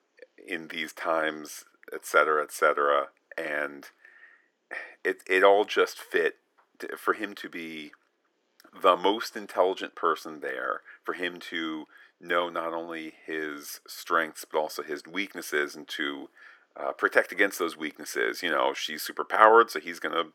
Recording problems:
thin; very; fading below 350 Hz

